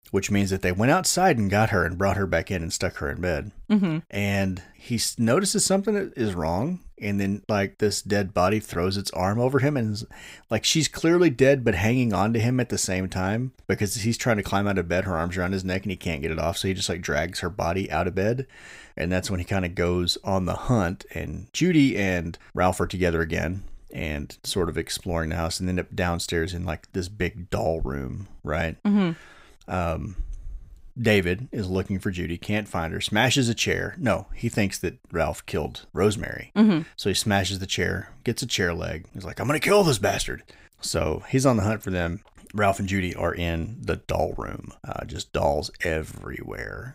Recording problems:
none

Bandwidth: 15.5 kHz